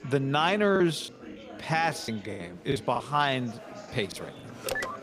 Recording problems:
chatter from many people; noticeable; throughout; 15 dB below the speech
choppy; very; at 1 s, at 2 s and at 4 s; 18% of the speech affected
phone ringing; noticeable; at 4.5 s; peak 4 dB below the speech

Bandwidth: 15 kHz